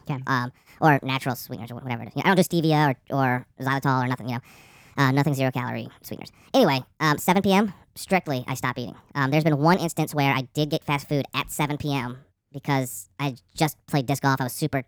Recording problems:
wrong speed and pitch; too fast and too high; 1.5 times normal speed

